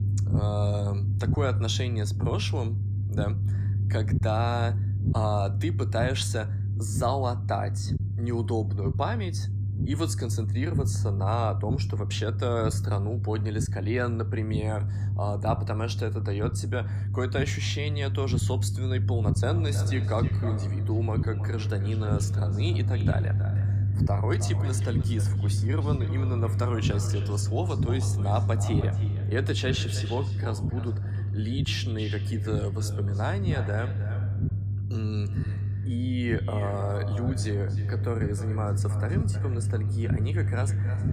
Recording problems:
echo of what is said; noticeable; from 19 s on; 310 ms later, 10 dB below the speech
low rumble; loud; throughout; 8 dB below the speech

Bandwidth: 15 kHz